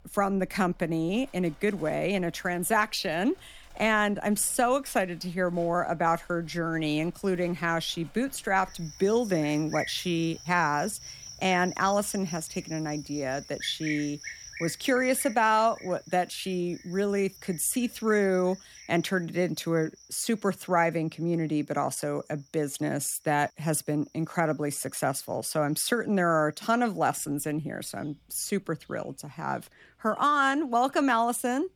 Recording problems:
animal sounds; noticeable; throughout; 15 dB below the speech

